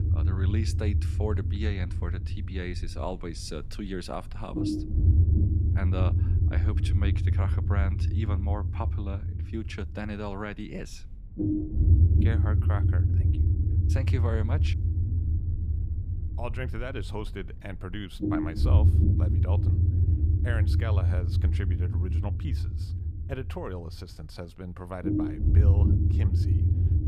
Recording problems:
low rumble; loud; throughout; as loud as the speech

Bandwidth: 14.5 kHz